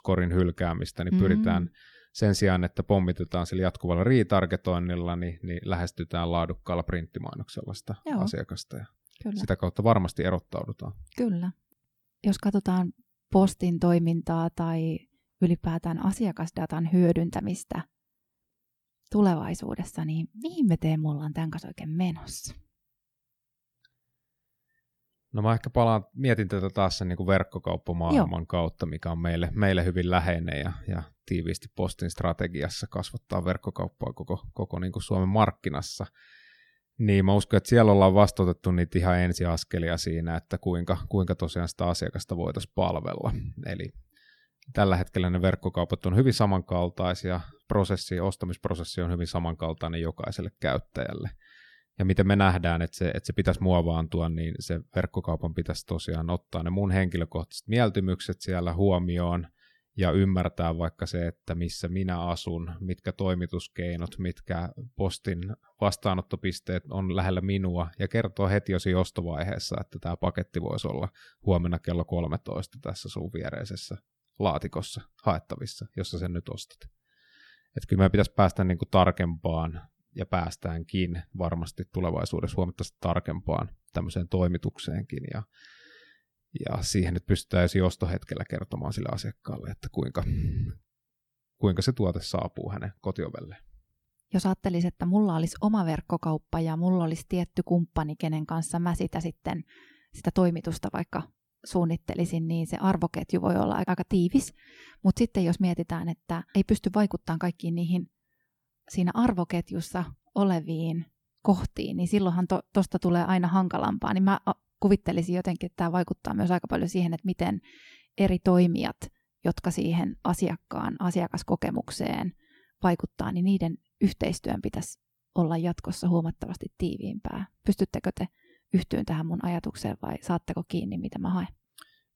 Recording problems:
none

